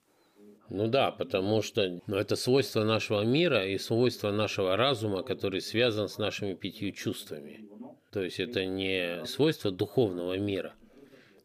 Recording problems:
voice in the background; faint; throughout; 25 dB below the speech

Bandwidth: 15 kHz